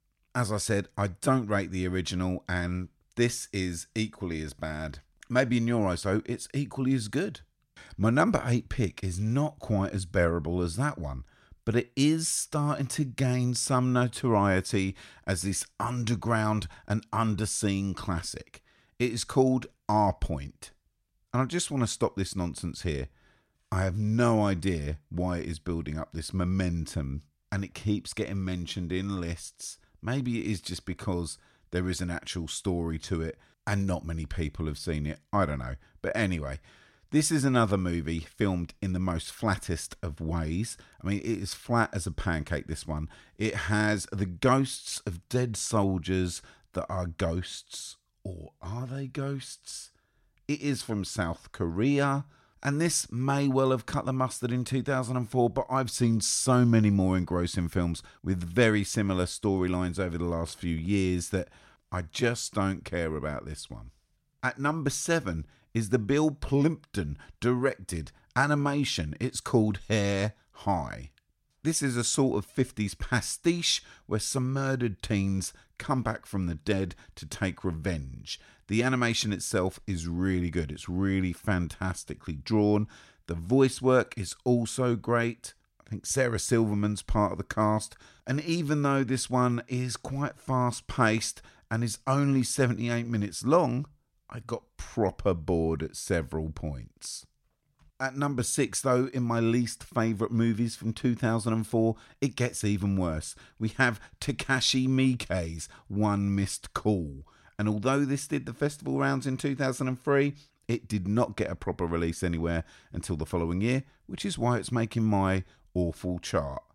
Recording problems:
none

